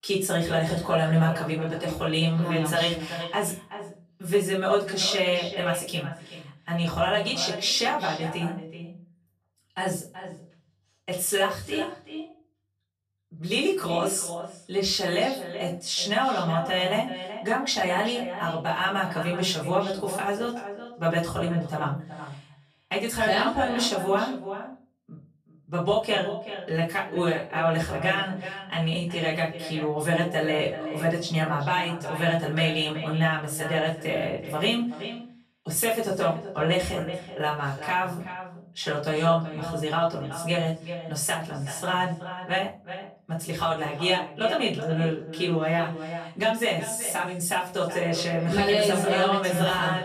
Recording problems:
echo of what is said; strong; throughout; 380 ms later, 10 dB below the speech
off-mic speech; far
room echo; slight; dies away in 0.3 s

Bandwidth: 14 kHz